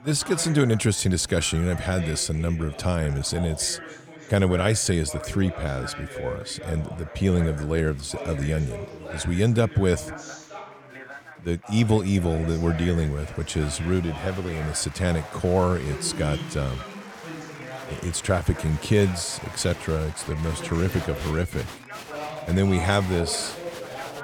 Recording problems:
chatter from many people; noticeable; throughout; 15 dB below the speech

